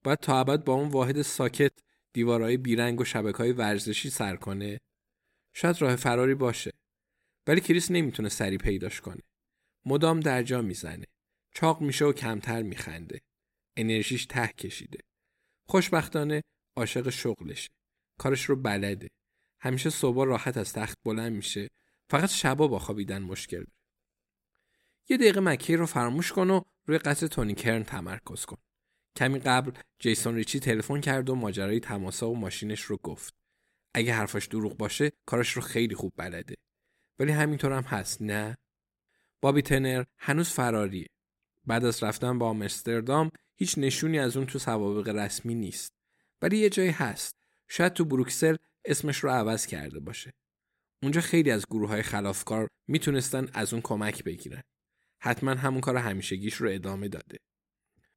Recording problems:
none

